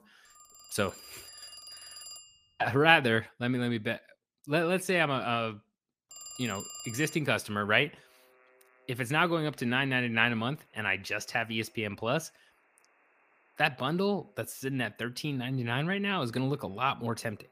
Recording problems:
alarms or sirens; noticeable; throughout; 15 dB below the speech

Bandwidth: 15 kHz